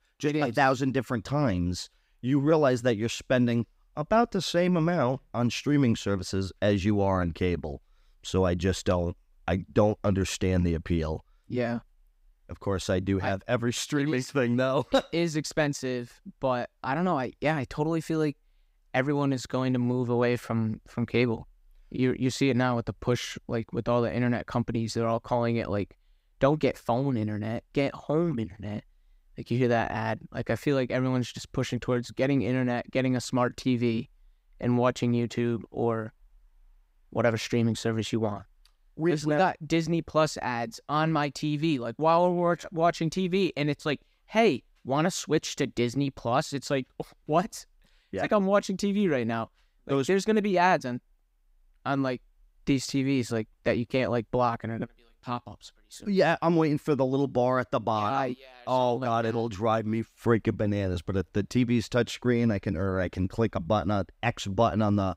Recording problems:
none

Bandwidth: 15.5 kHz